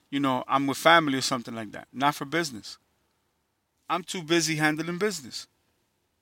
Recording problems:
none

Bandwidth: 16.5 kHz